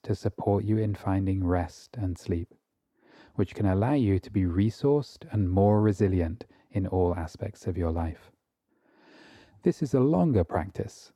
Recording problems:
muffled; slightly; fading above 1.5 kHz

